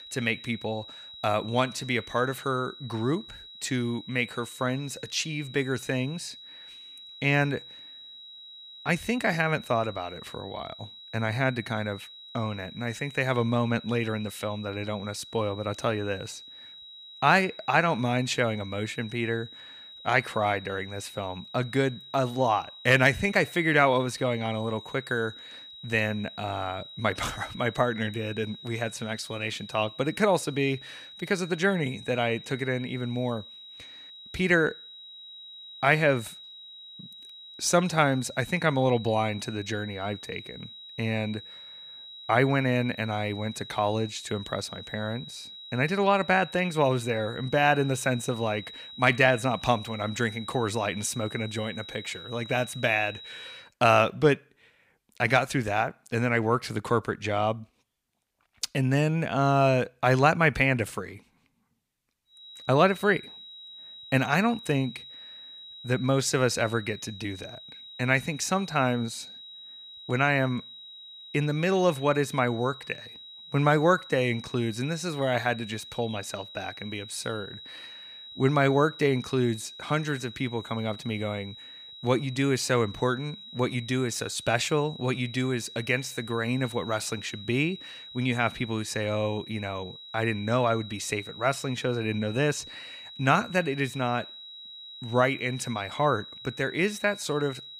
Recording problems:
high-pitched whine; noticeable; until 54 s and from 1:02 on; 4 kHz, 15 dB below the speech

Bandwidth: 15 kHz